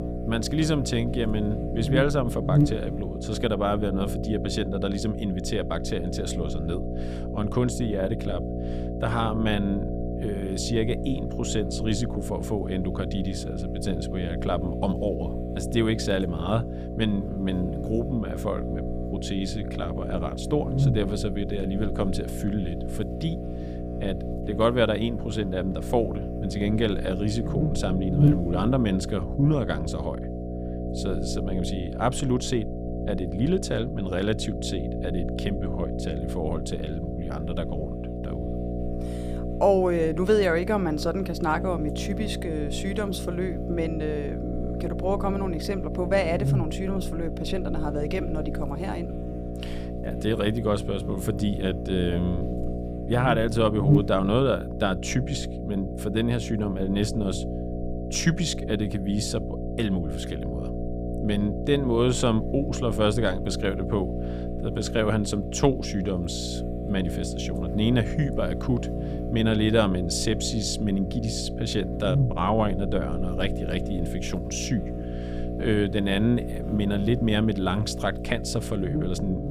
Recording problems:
electrical hum; loud; throughout; 60 Hz, 7 dB below the speech

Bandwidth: 15 kHz